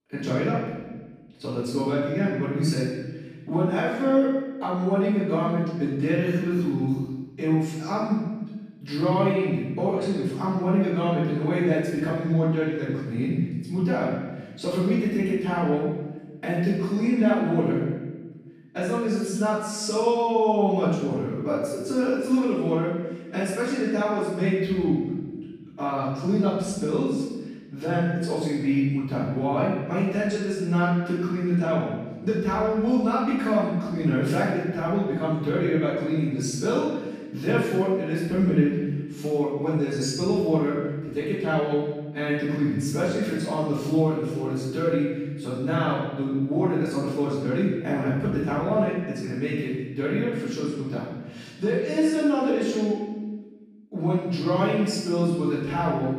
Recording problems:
room echo; strong; dies away in 1.2 s
off-mic speech; far

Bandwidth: 14.5 kHz